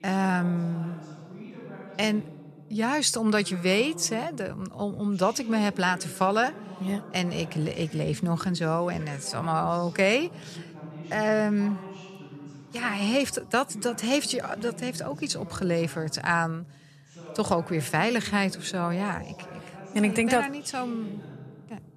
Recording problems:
voice in the background; noticeable; throughout; 15 dB below the speech

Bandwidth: 13.5 kHz